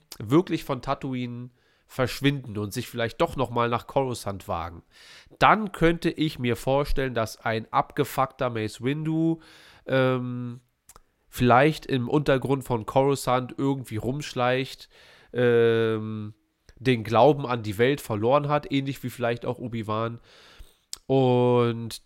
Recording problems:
none

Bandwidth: 16 kHz